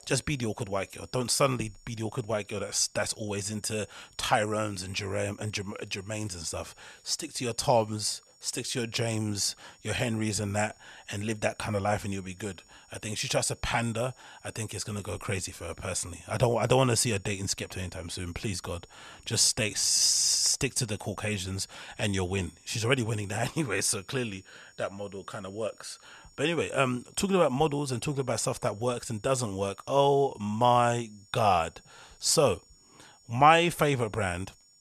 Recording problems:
high-pitched whine; faint; throughout; 7 kHz, 30 dB below the speech

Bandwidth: 14.5 kHz